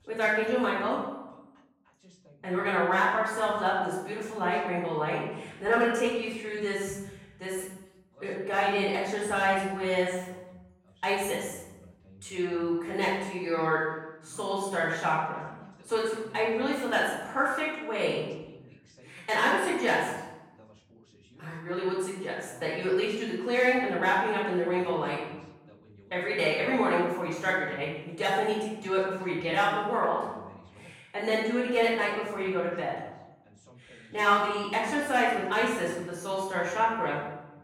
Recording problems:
off-mic speech; far
room echo; noticeable; dies away in 0.9 s
voice in the background; faint; throughout; 30 dB below the speech

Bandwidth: 16.5 kHz